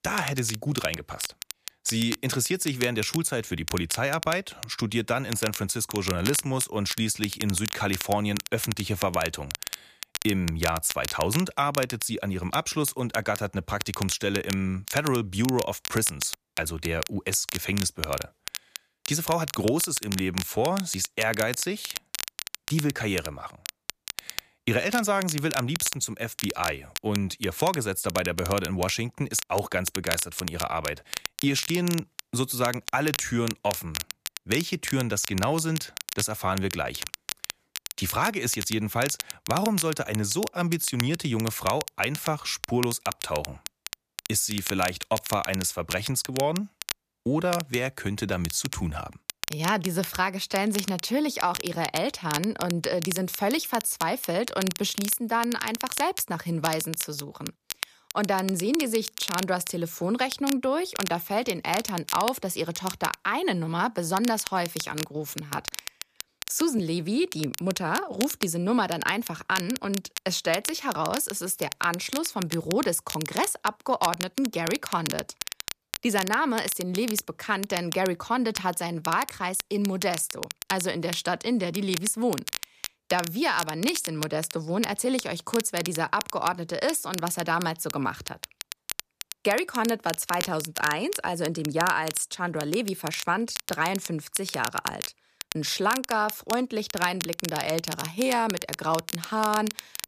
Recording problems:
crackle, like an old record; loud; 8 dB below the speech

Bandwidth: 14.5 kHz